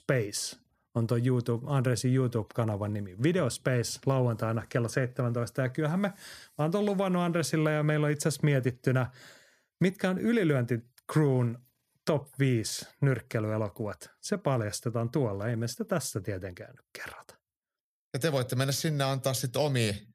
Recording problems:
none

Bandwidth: 14.5 kHz